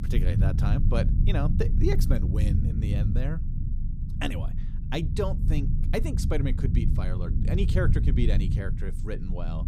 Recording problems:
low rumble; loud; throughout; 5 dB below the speech

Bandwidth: 15 kHz